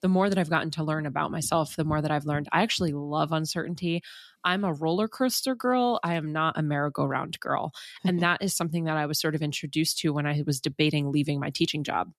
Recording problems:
none

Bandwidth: 13.5 kHz